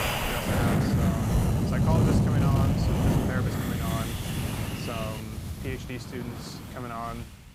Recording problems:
wind noise on the microphone; heavy; 5 dB above the speech

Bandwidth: 15.5 kHz